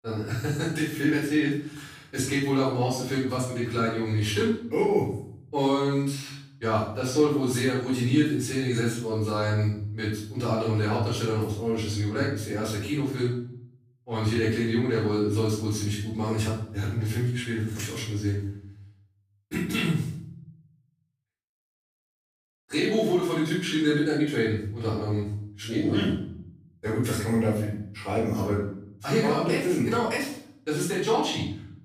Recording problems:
off-mic speech; far
room echo; noticeable; dies away in 0.6 s

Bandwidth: 15 kHz